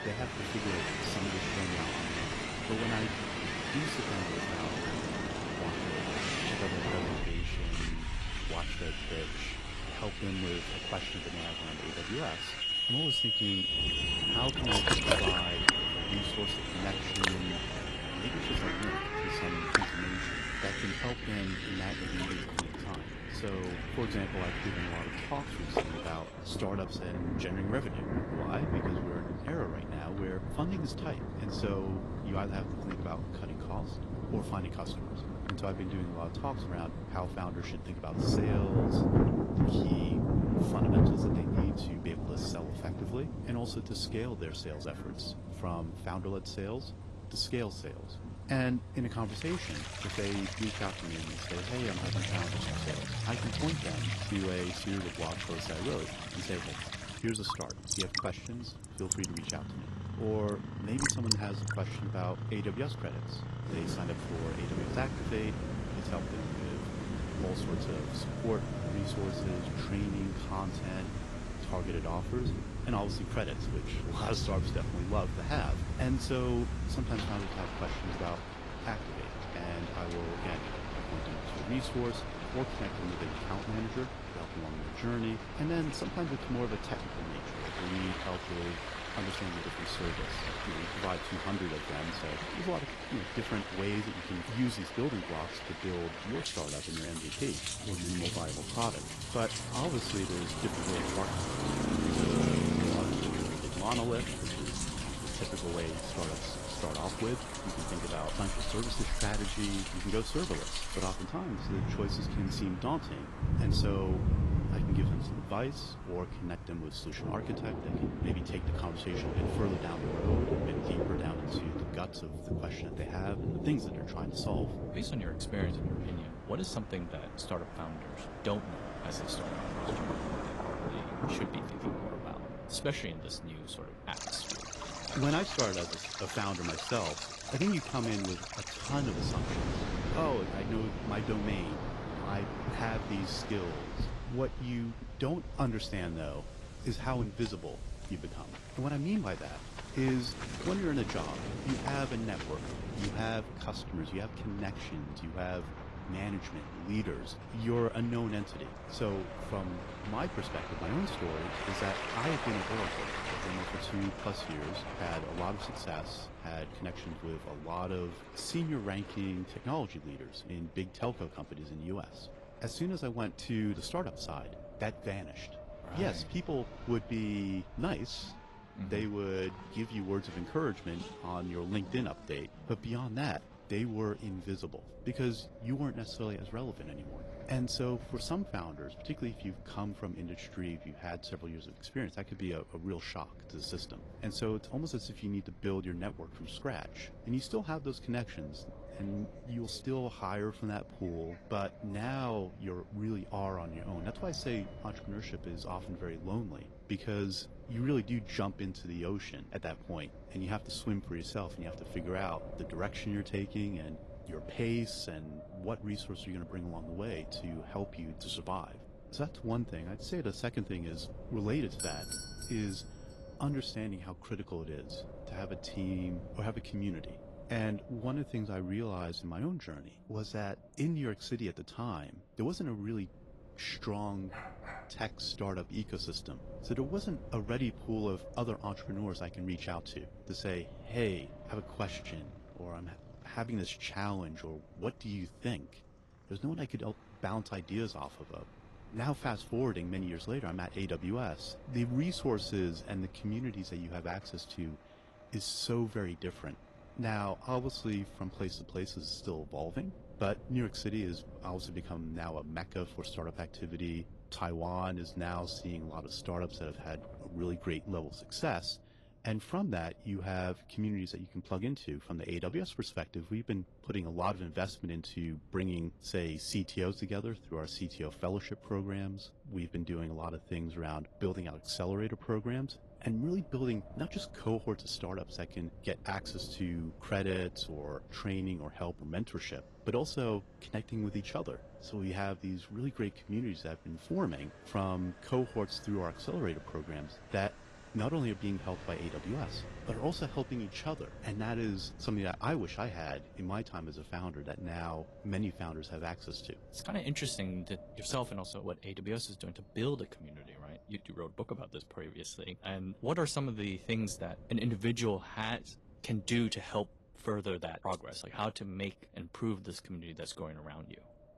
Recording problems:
garbled, watery; slightly; nothing above 13.5 kHz
rain or running water; very loud; until 2:44; 1 dB above the speech
traffic noise; loud; throughout; 2 dB below the speech
wind noise on the microphone; occasional gusts; 15 dB below the speech
doorbell; loud; at 3:42; peak level with the speech
dog barking; noticeable; at 3:54; peak 8 dB below the speech

